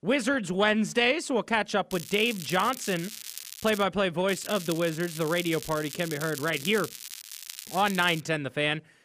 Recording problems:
crackling; noticeable; from 2 to 4 s and from 4.5 to 8 s; 10 dB below the speech

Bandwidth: 15 kHz